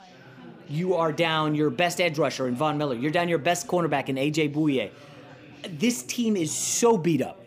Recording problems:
background chatter; faint; throughout; 3 voices, 20 dB below the speech

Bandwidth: 15 kHz